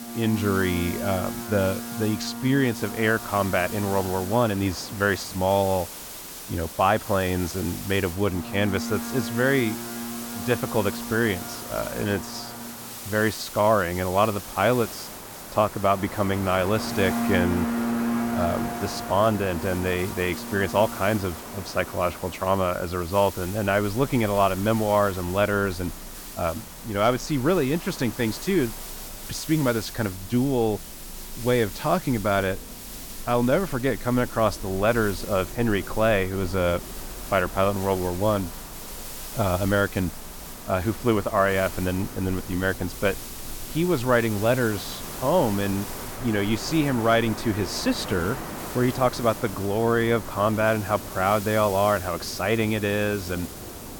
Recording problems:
train or aircraft noise; noticeable; throughout; 10 dB below the speech
hiss; noticeable; throughout; 15 dB below the speech

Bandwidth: 17.5 kHz